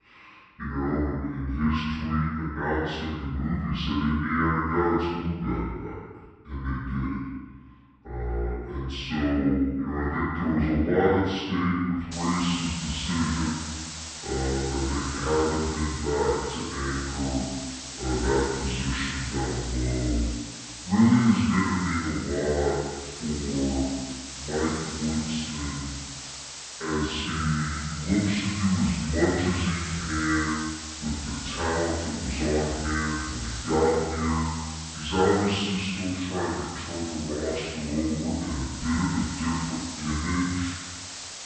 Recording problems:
room echo; strong; dies away in 1.1 s
off-mic speech; far
wrong speed and pitch; too slow and too low; 0.6 times normal speed
hiss; loud; from 12 s on; 9 dB below the speech

